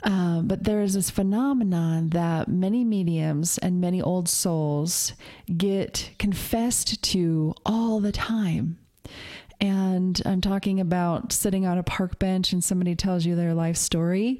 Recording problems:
squashed, flat; heavily

